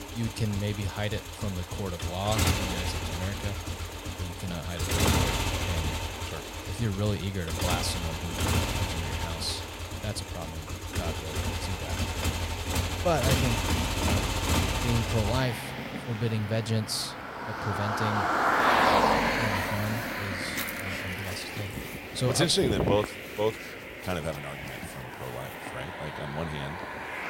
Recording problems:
traffic noise; very loud; throughout; 2 dB above the speech

